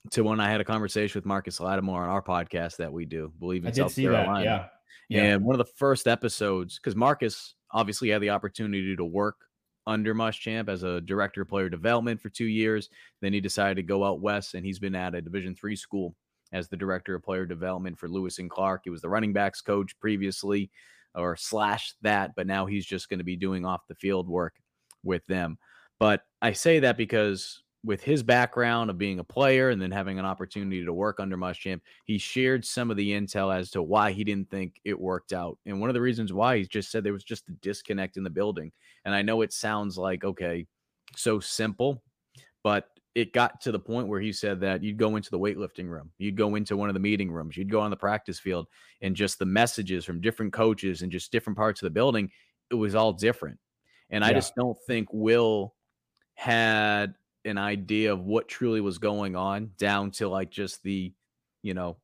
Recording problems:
none

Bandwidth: 15 kHz